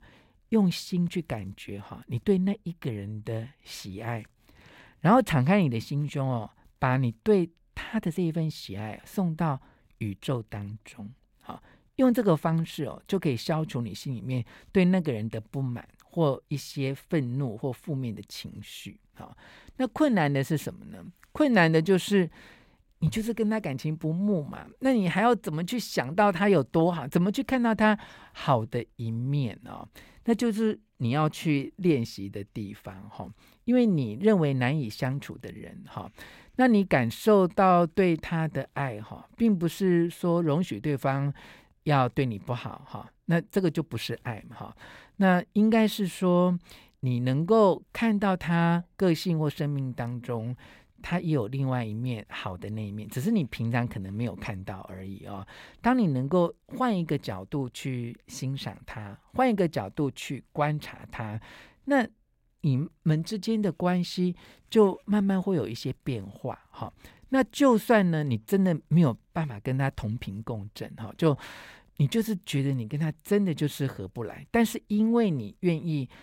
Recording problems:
none

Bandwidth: 16 kHz